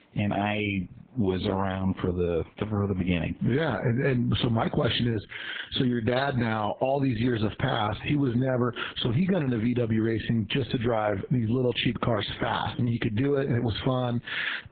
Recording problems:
garbled, watery; badly; nothing above 4 kHz
squashed, flat; heavily
high frequencies cut off; slight

